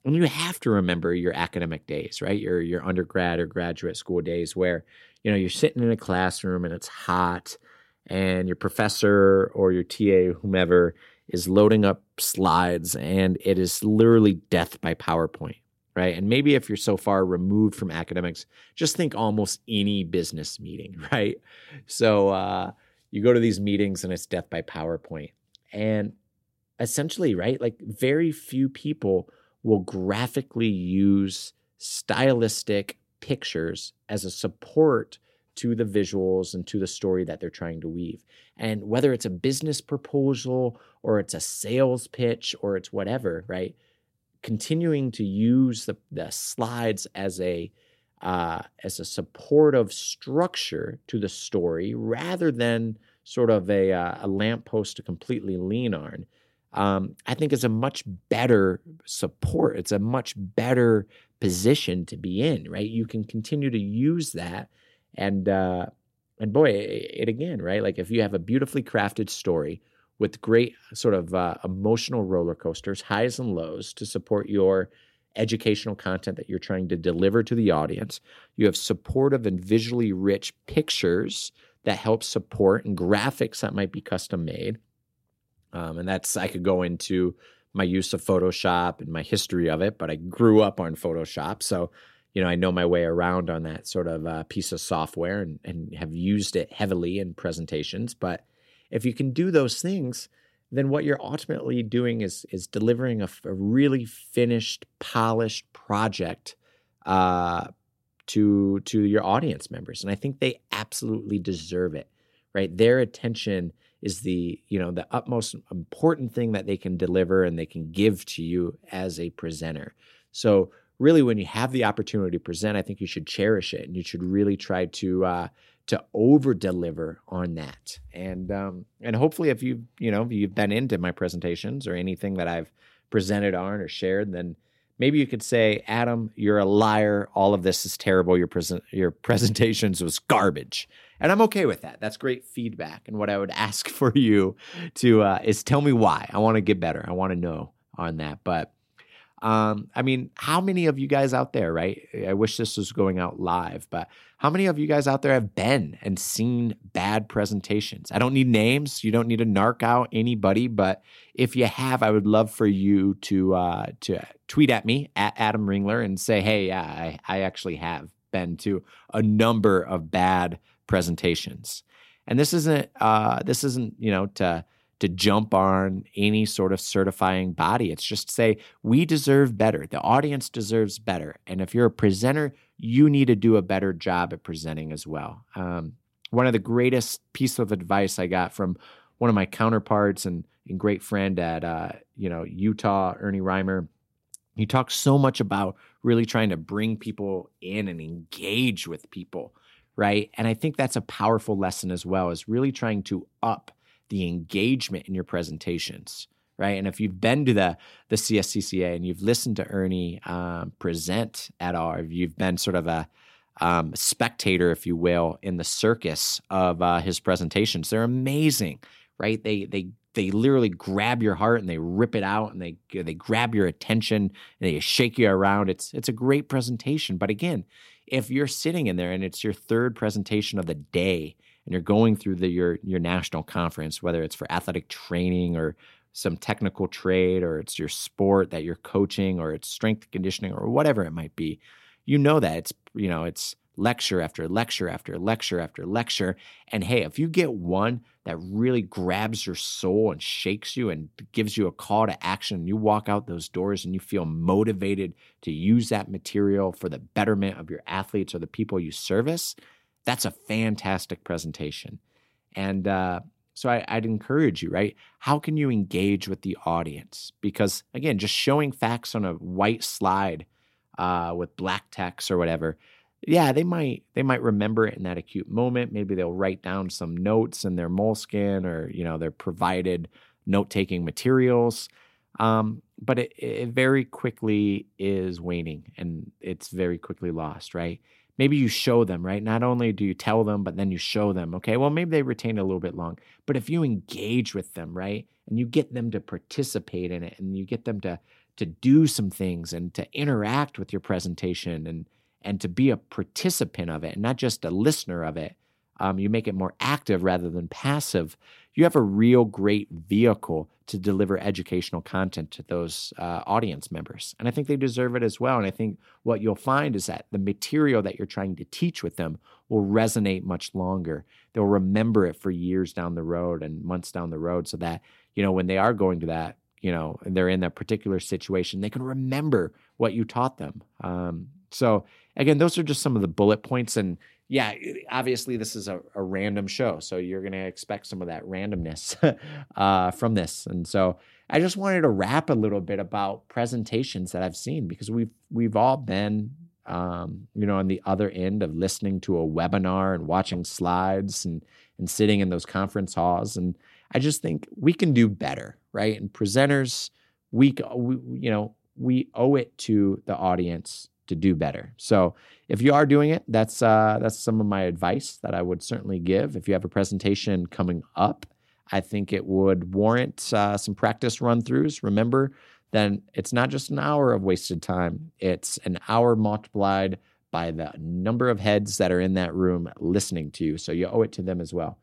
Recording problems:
none

